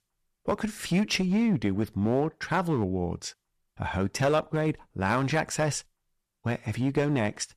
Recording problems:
distortion; slight; 6% of the sound clipped

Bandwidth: 14.5 kHz